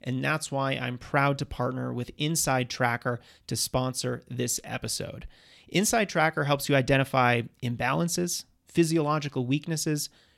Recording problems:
none

